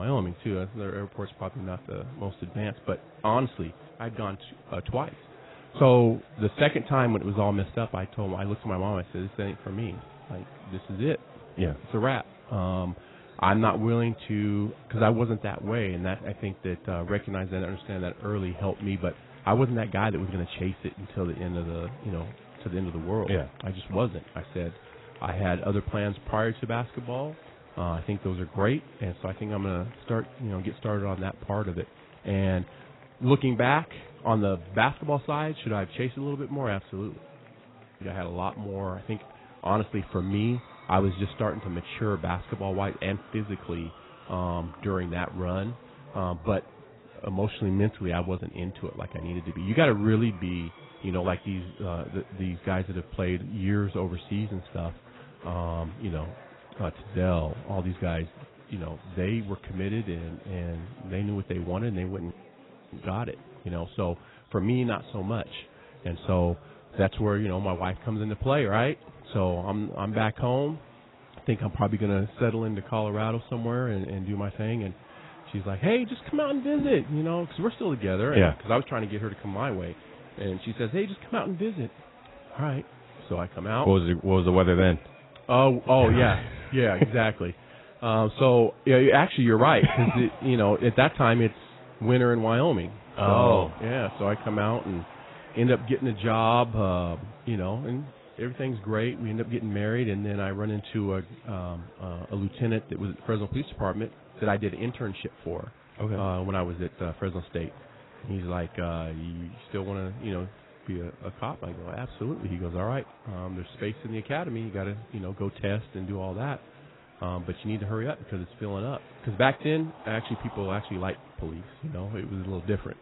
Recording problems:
garbled, watery; badly; nothing above 4 kHz
chatter from many people; faint; throughout; 20 dB below the speech
abrupt cut into speech; at the start

